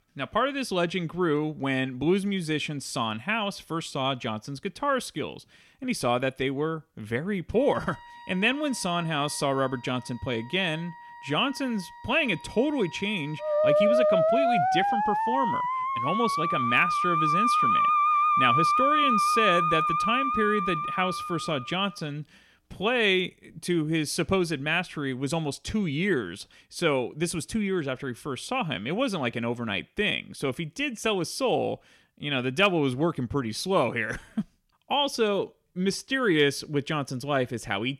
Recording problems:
background music; very loud; until 24 s; 4 dB above the speech

